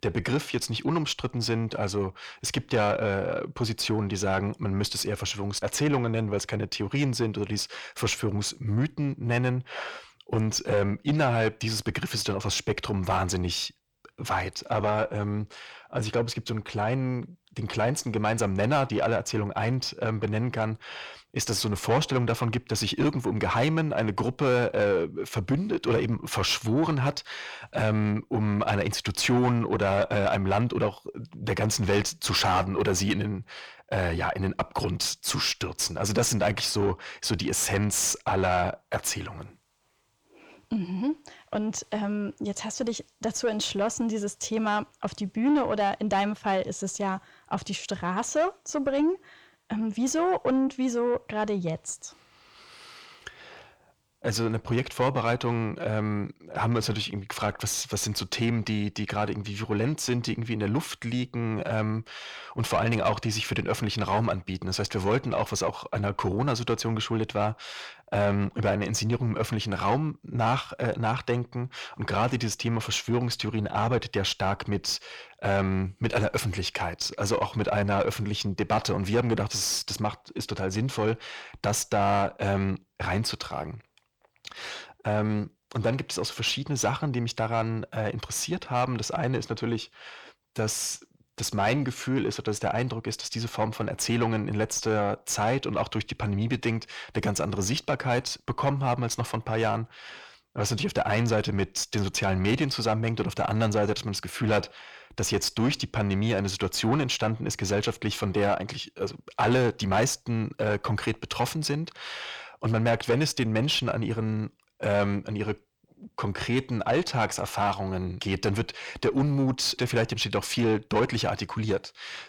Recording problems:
distortion; slight; 10 dB below the speech

